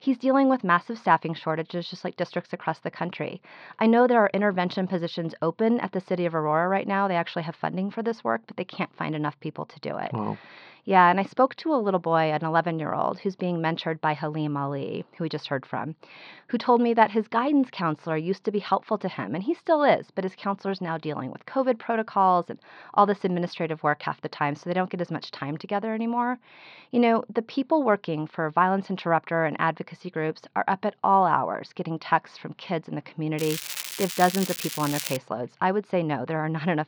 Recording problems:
muffled; slightly; fading above 4.5 kHz
crackling; loud; from 33 to 35 s; 6 dB below the speech

